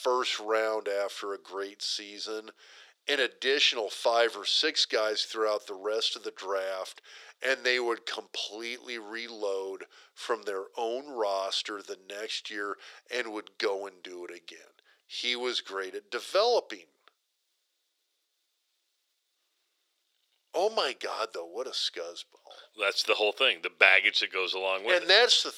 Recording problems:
thin; very; fading below 400 Hz

